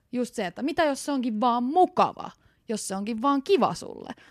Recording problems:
none

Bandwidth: 14.5 kHz